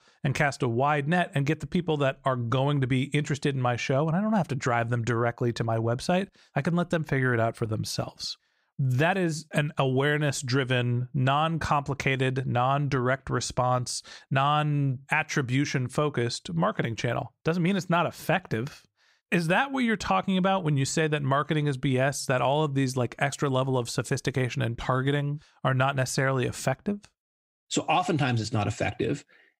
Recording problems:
none

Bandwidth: 15.5 kHz